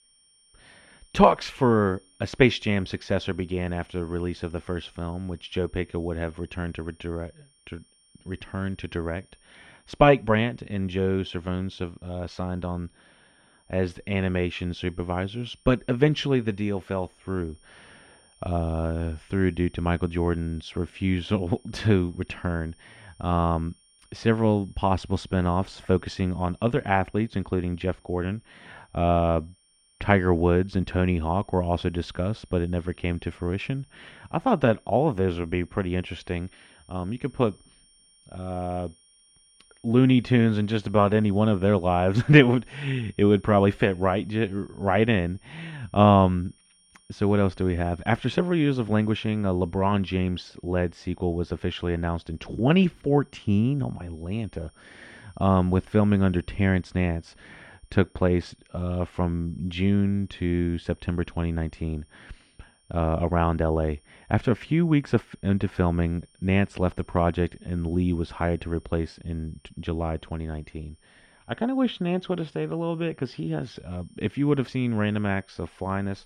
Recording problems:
muffled; very slightly; fading above 3 kHz
high-pitched whine; faint; throughout; 9 kHz, 35 dB below the speech

